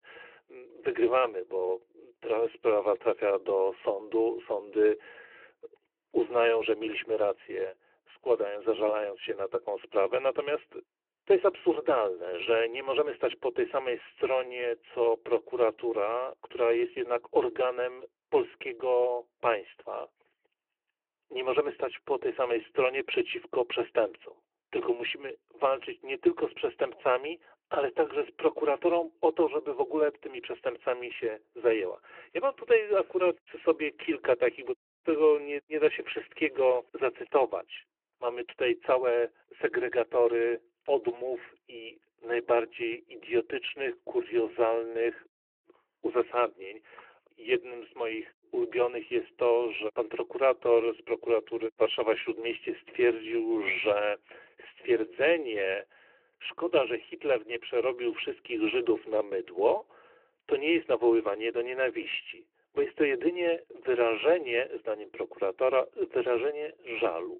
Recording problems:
phone-call audio

